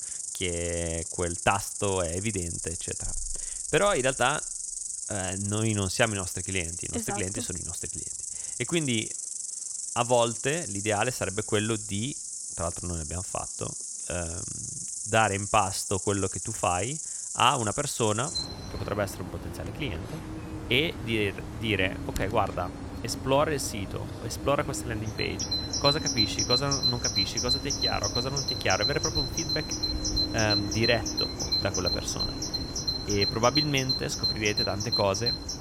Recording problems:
animal sounds; loud; throughout; 1 dB below the speech

